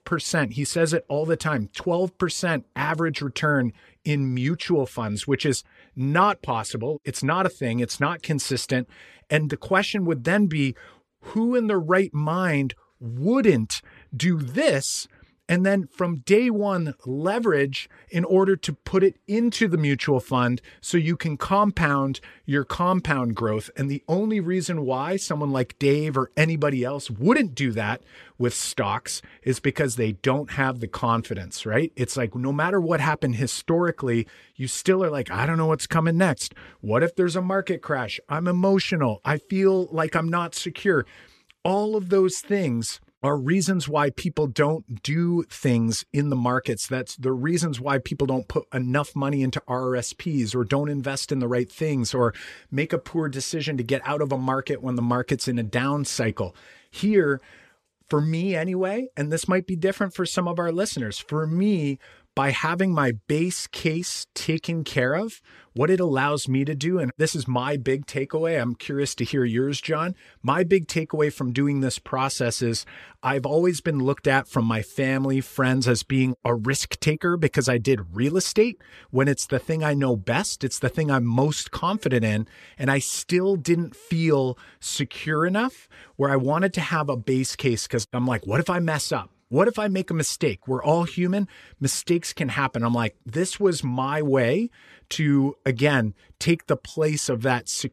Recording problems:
none

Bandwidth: 14.5 kHz